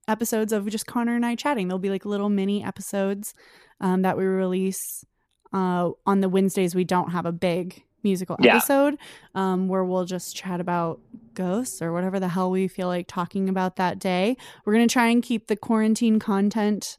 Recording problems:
none

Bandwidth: 14.5 kHz